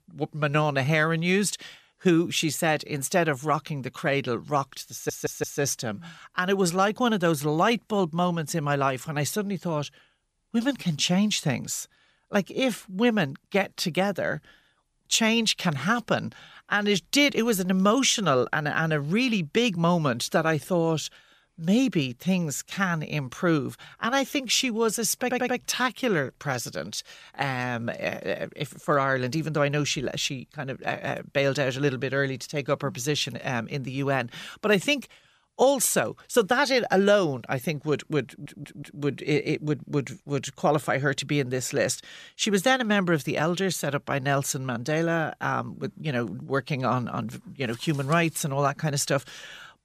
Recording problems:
audio stuttering; at 5 s, at 25 s and at 38 s

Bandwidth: 14.5 kHz